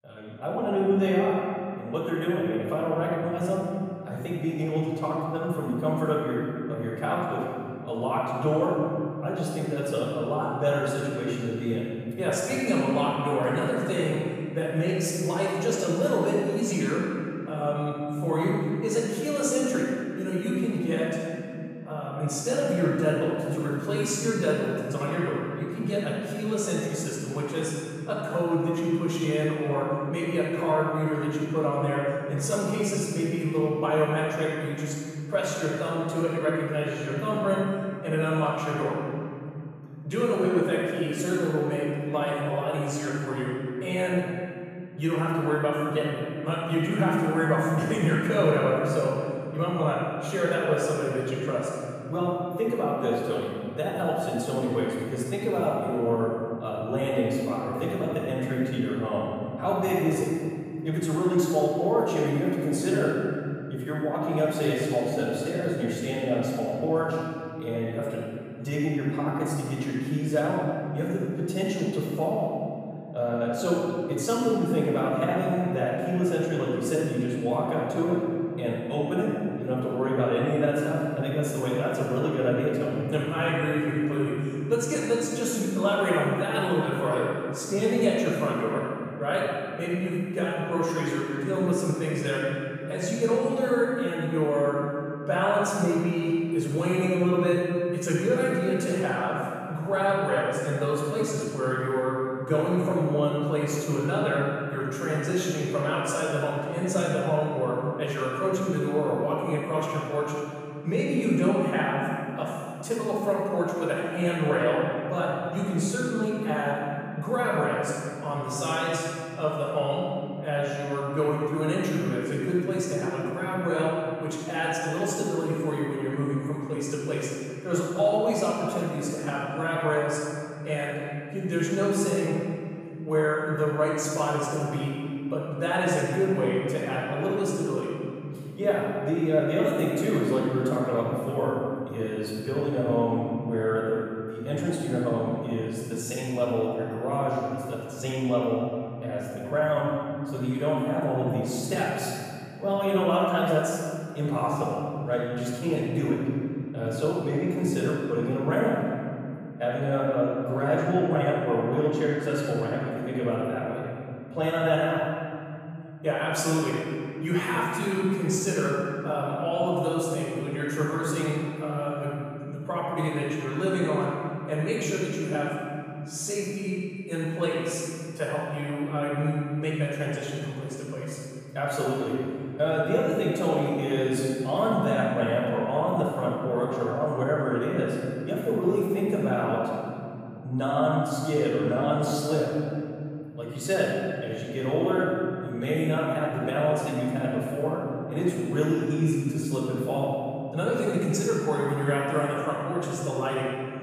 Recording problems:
room echo; strong; dies away in 3 s
off-mic speech; far

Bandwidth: 14.5 kHz